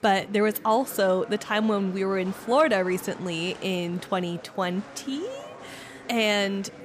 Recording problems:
murmuring crowd; noticeable; throughout; 20 dB below the speech

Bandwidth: 15 kHz